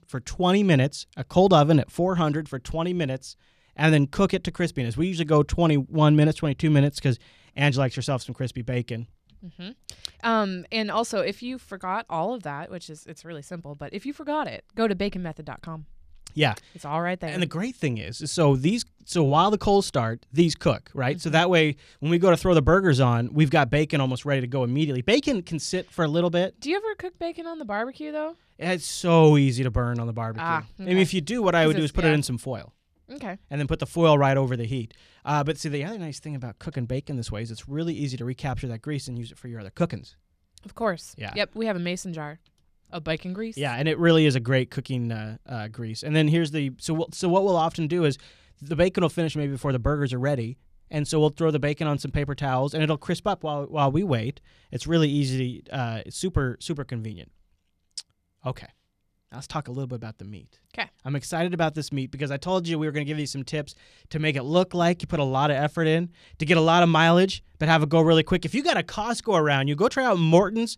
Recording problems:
none

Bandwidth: 14.5 kHz